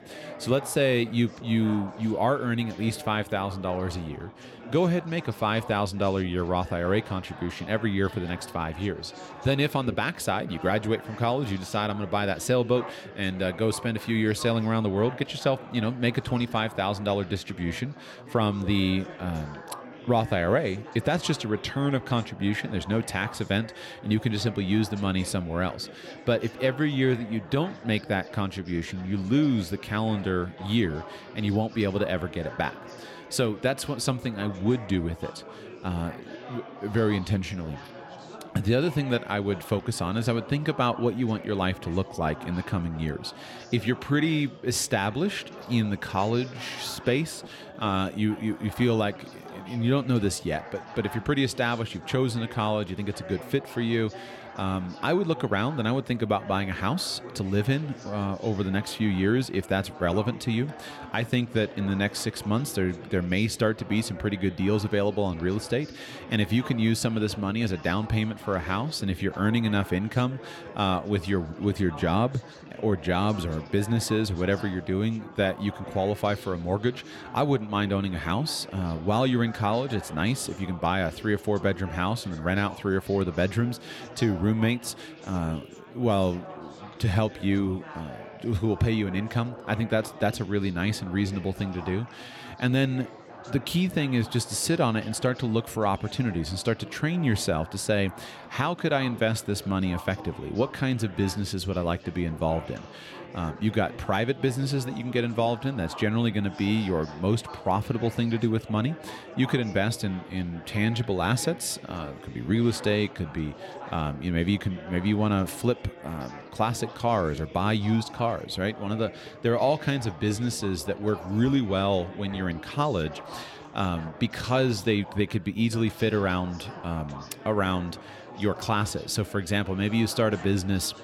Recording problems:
chatter from many people; noticeable; throughout; 15 dB below the speech

